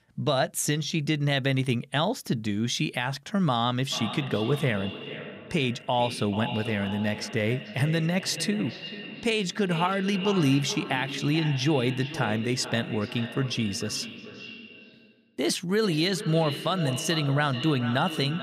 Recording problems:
echo of what is said; strong; from 4 s on; 440 ms later, 10 dB below the speech

